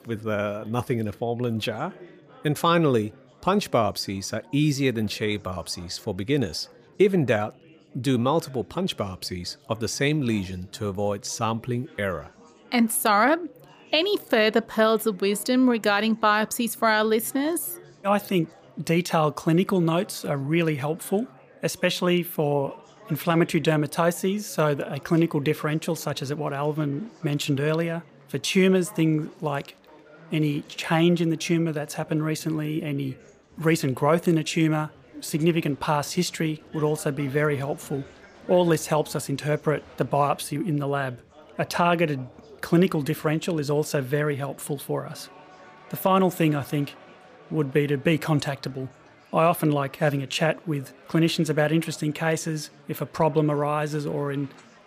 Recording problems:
chatter from many people; faint; throughout; 25 dB below the speech

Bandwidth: 15 kHz